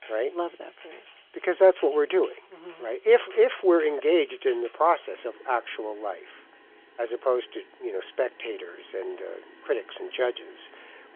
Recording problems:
phone-call audio; nothing above 3.5 kHz
household noises; faint; throughout; 25 dB below the speech

